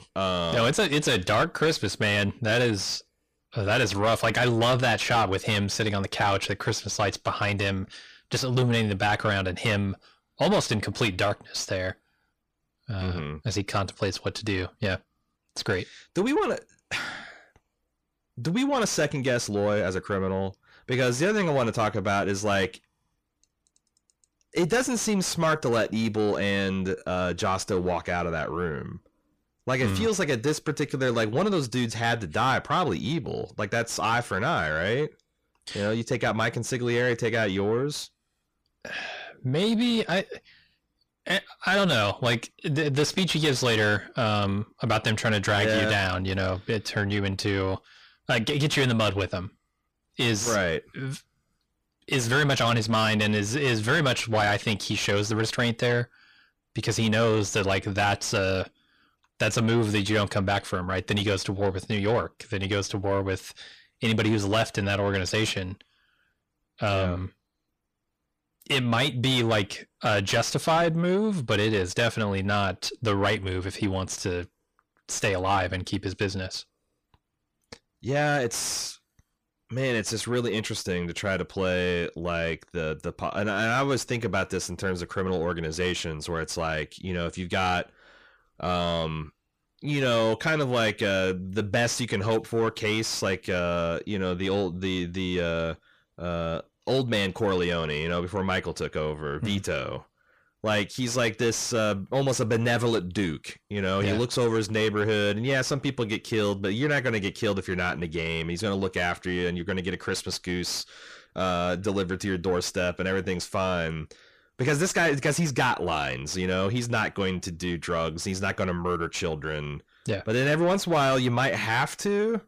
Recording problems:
distortion; heavy; 6 dB below the speech

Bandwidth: 15 kHz